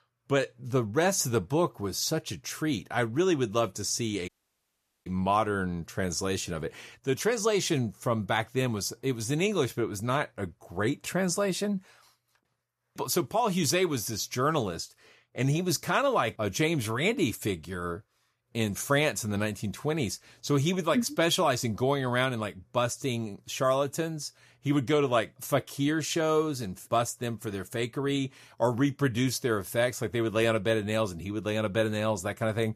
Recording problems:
audio cutting out; at 4.5 s for 1 s

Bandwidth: 14.5 kHz